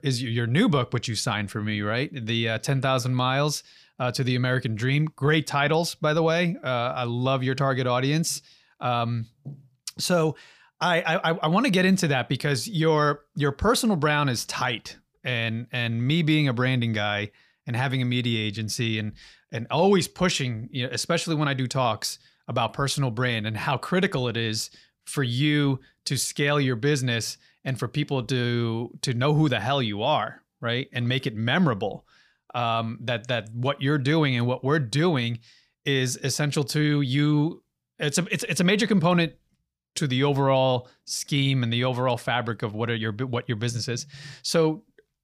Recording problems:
none

